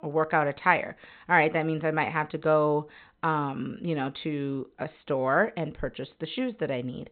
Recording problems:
high frequencies cut off; severe; nothing above 4 kHz

